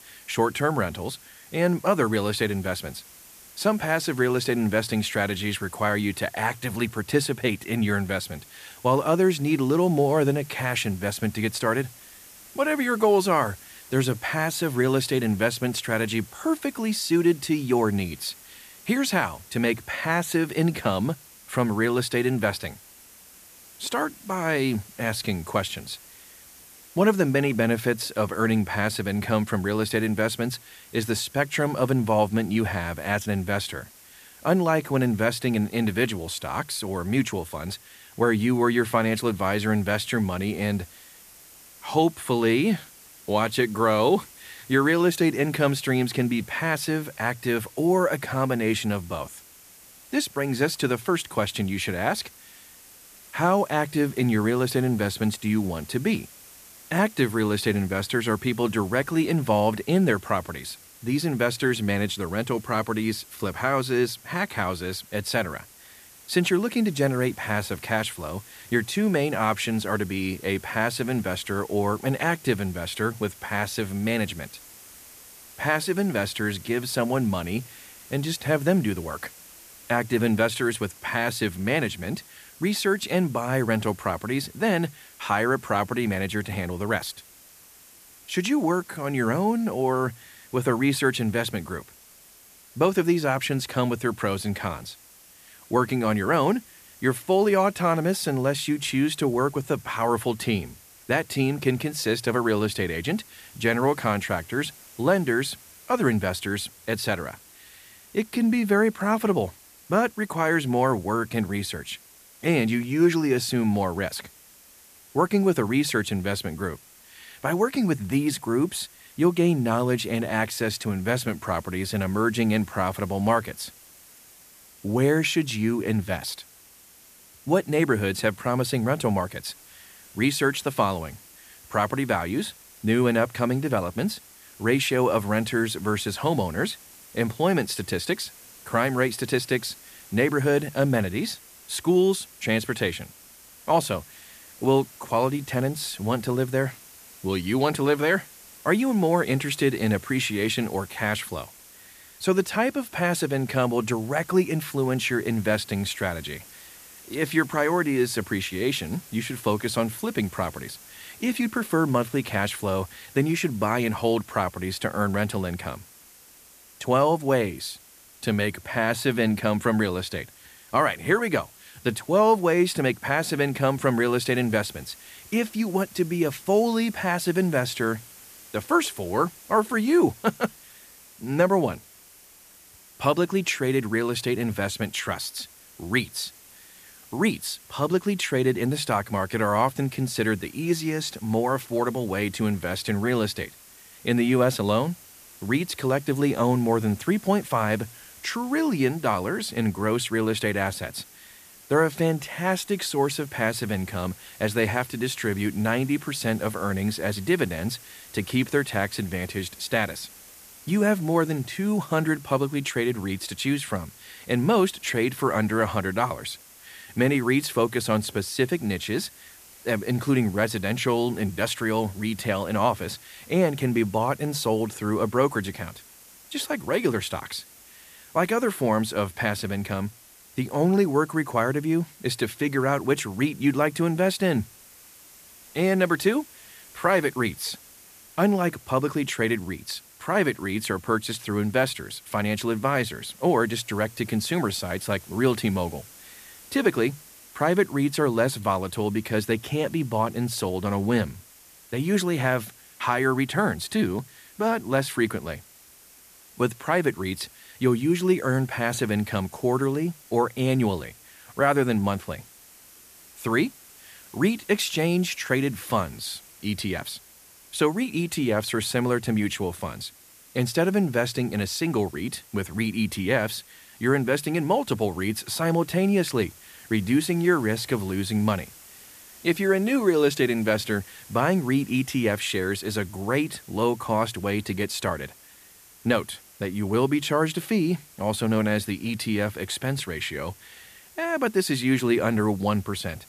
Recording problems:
hiss; faint; throughout; 20 dB below the speech

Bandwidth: 14.5 kHz